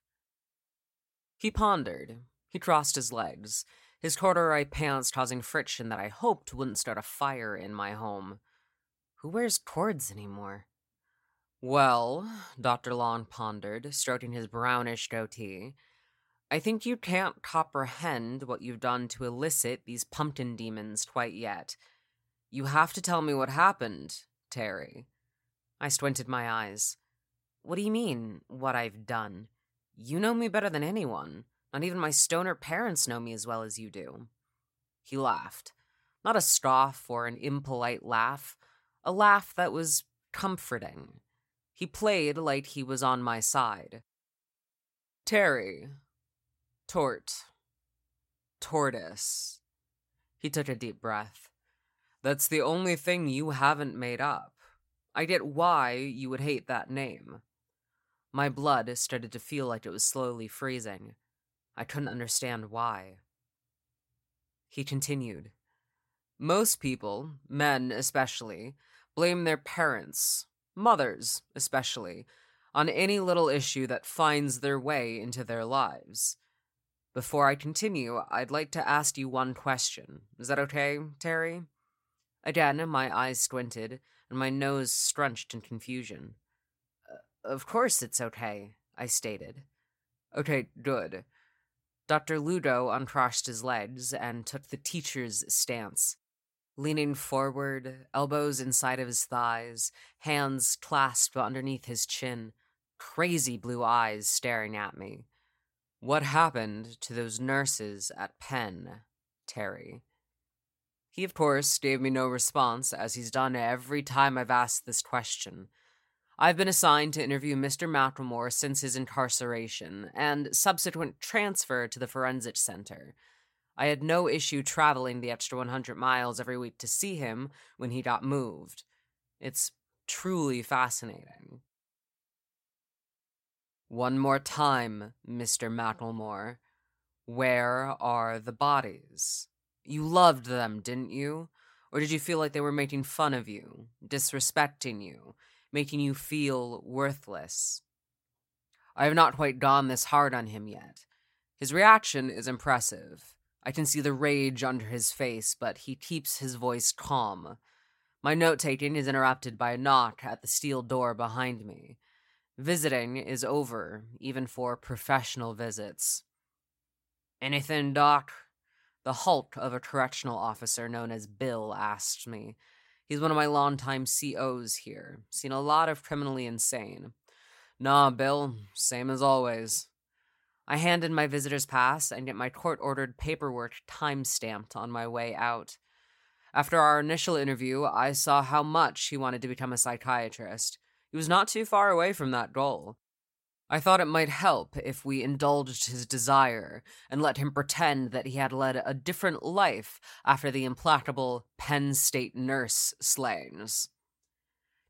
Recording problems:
none

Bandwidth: 16 kHz